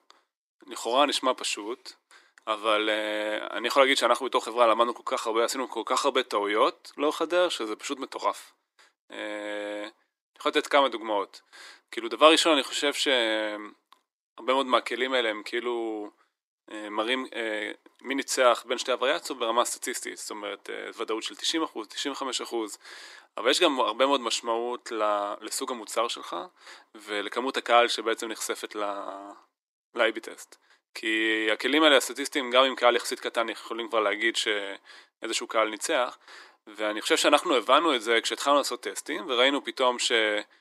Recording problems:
thin; somewhat; fading below 300 Hz

